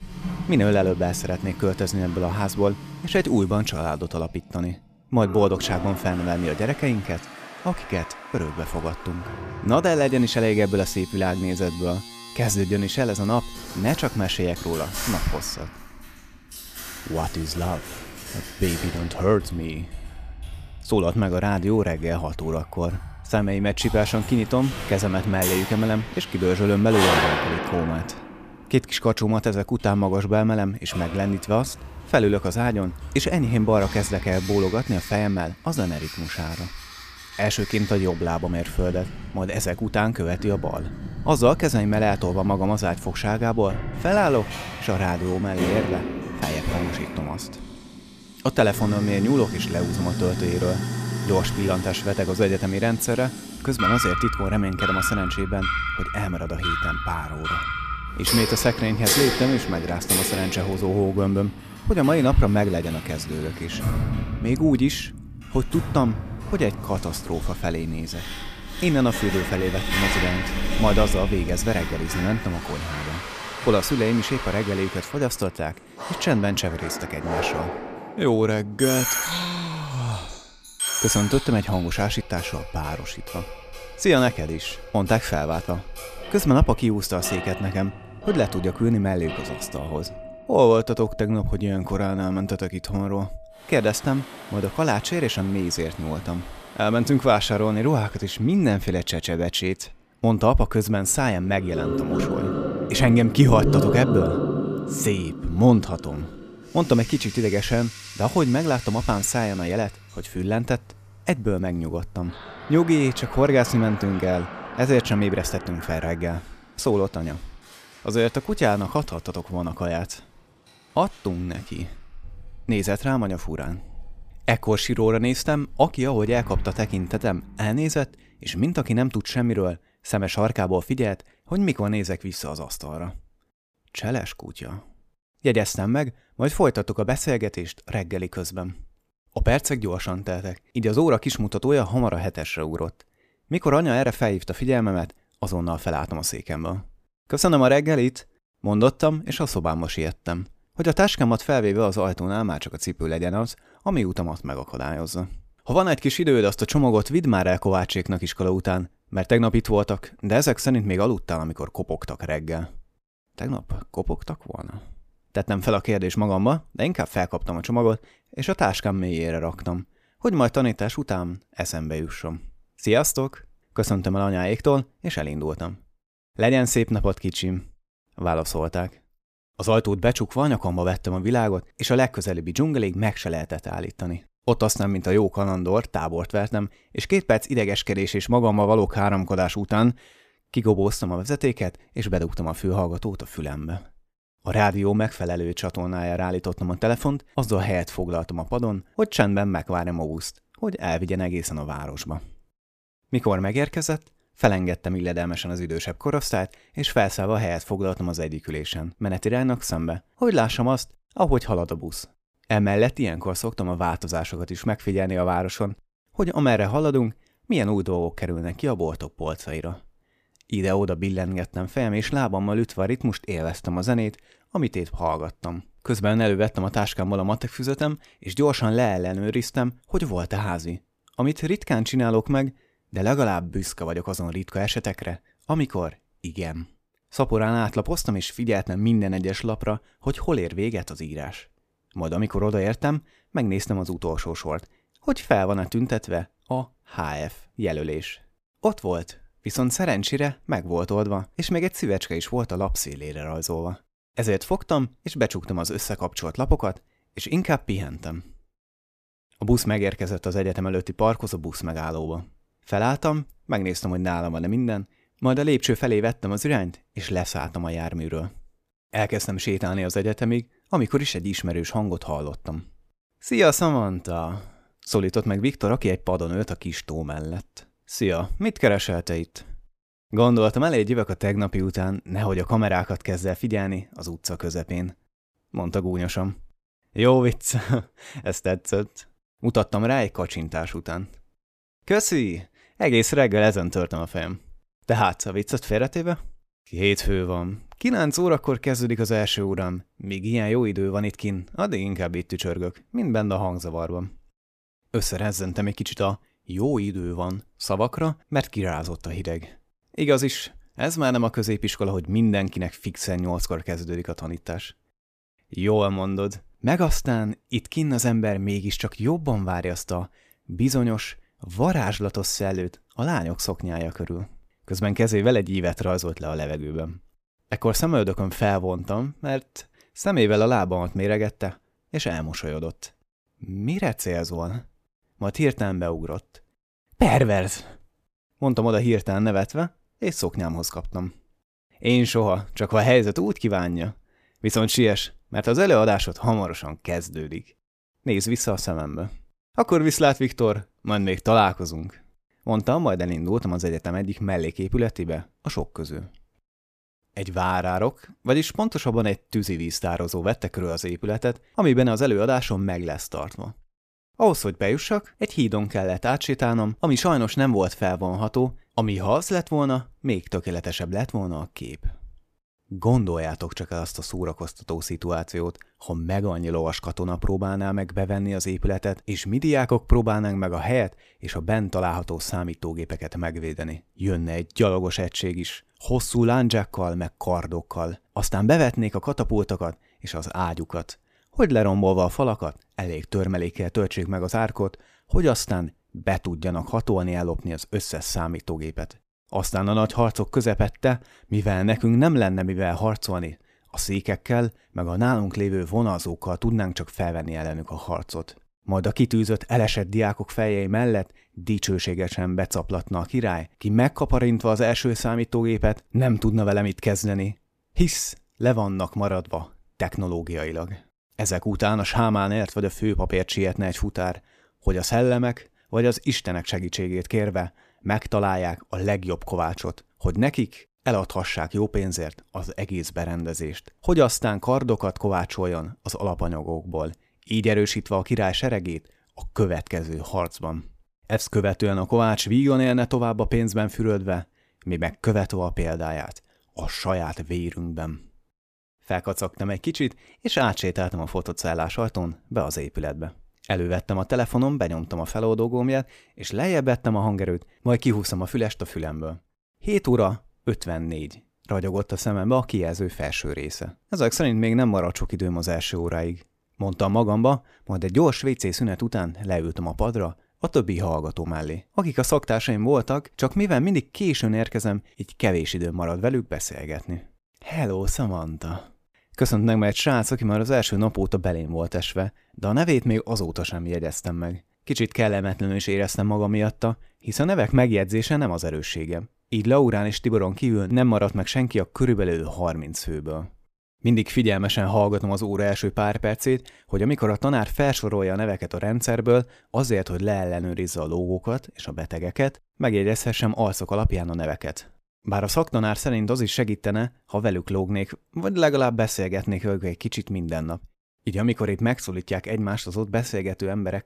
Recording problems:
household noises; loud; until 2:07; 6 dB below the speech

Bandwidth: 14.5 kHz